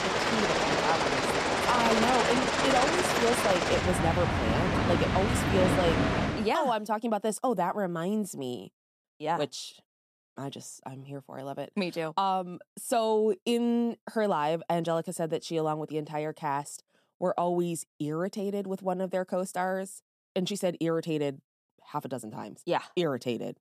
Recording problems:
train or aircraft noise; very loud; until 6.5 s; 4 dB above the speech

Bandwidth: 14 kHz